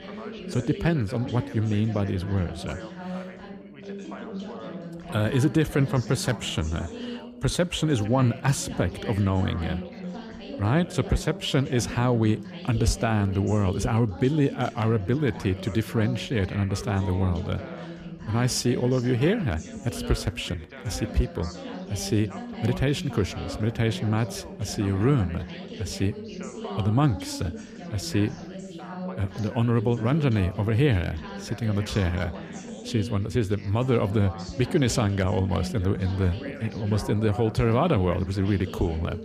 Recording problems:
background chatter; noticeable; throughout; 3 voices, 10 dB below the speech

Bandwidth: 14.5 kHz